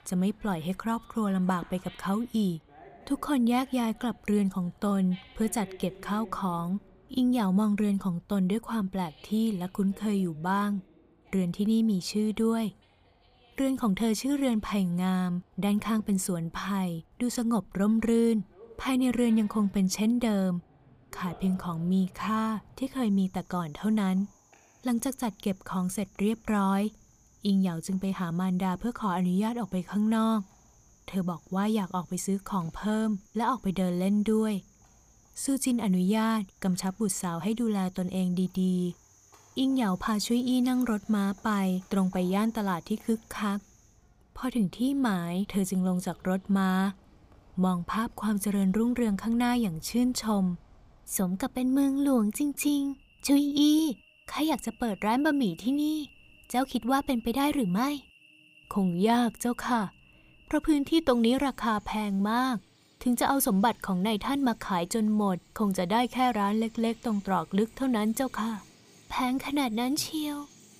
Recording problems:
animal sounds; faint; throughout; 30 dB below the speech

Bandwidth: 15 kHz